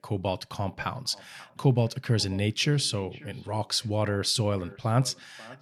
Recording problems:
echo of what is said; faint; throughout; 540 ms later, 25 dB below the speech

